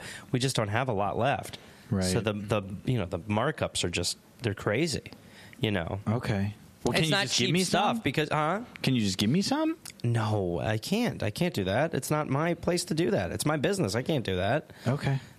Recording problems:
squashed, flat; heavily

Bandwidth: 14.5 kHz